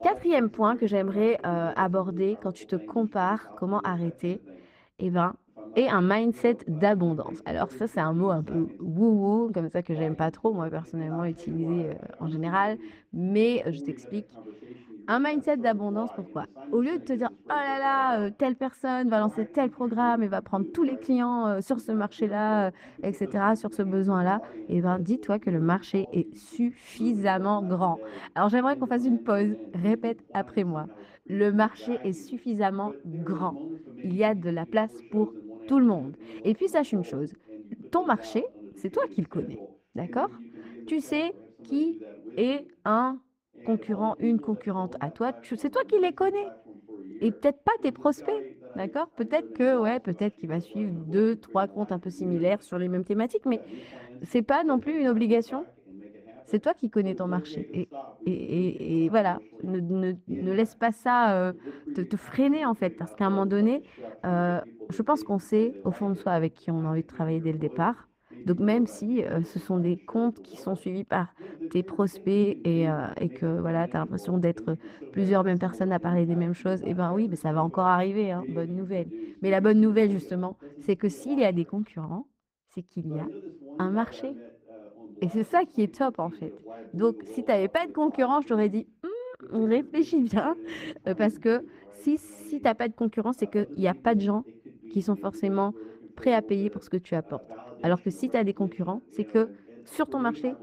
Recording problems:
muffled; slightly; fading above 2.5 kHz
garbled, watery; slightly; nothing above 15.5 kHz
voice in the background; noticeable; throughout; 15 dB below the speech

